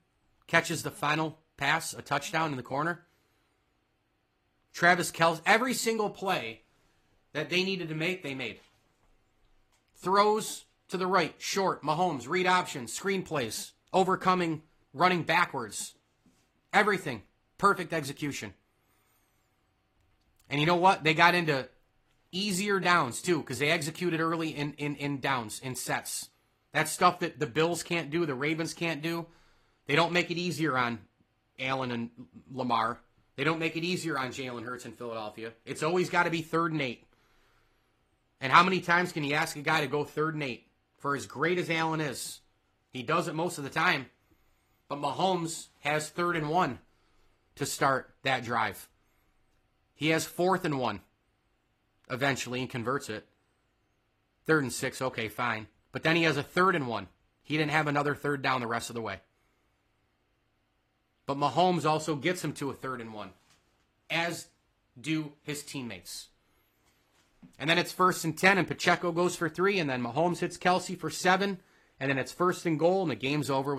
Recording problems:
garbled, watery; slightly; nothing above 14.5 kHz
abrupt cut into speech; at the end

